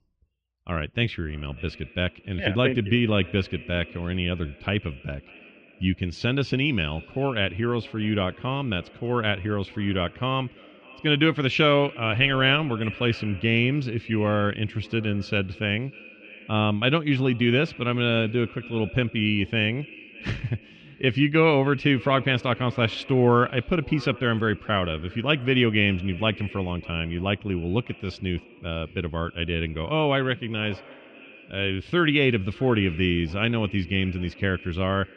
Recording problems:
muffled; very; fading above 3 kHz
echo of what is said; faint; throughout; 600 ms later, 20 dB below the speech

